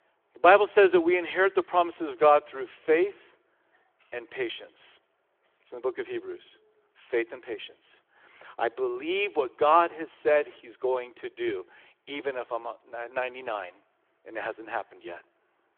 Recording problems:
phone-call audio

